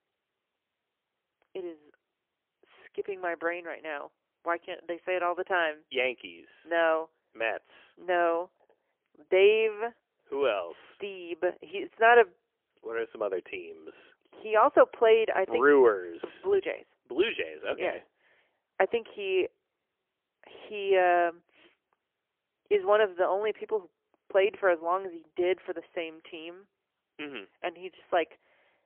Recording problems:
phone-call audio; poor line; nothing above 3 kHz

